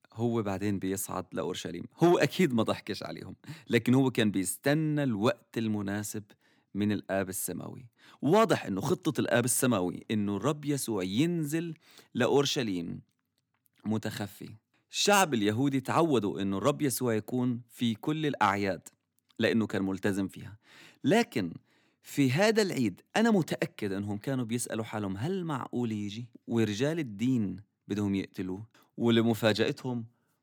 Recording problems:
none

